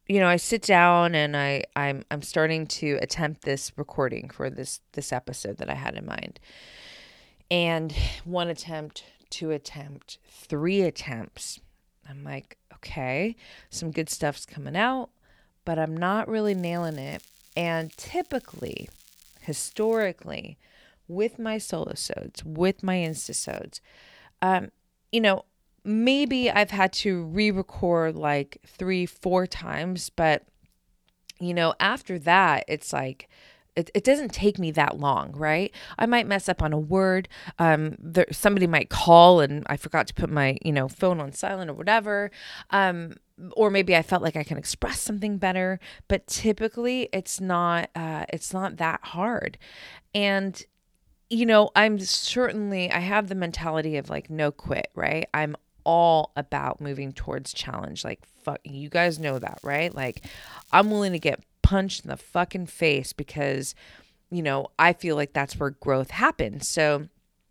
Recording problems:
crackling; faint; from 16 to 20 s, at 23 s and from 59 s to 1:01; 30 dB below the speech

